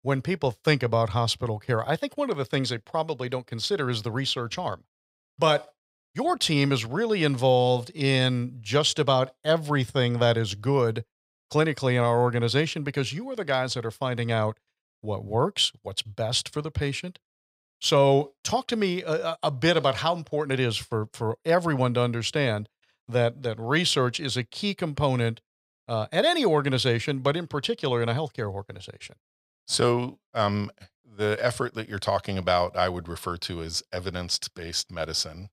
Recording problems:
none

